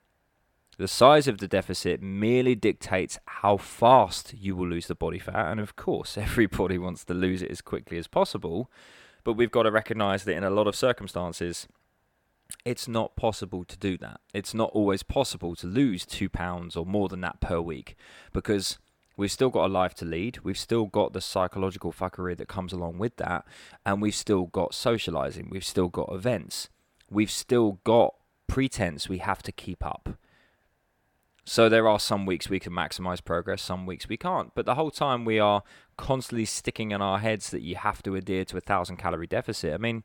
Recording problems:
none

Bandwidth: 17.5 kHz